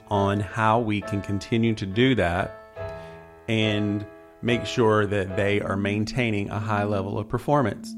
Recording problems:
background music; noticeable; throughout; 15 dB below the speech

